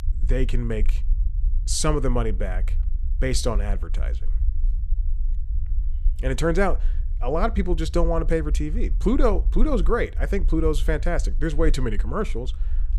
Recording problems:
low rumble; faint; throughout; 25 dB below the speech

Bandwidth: 15 kHz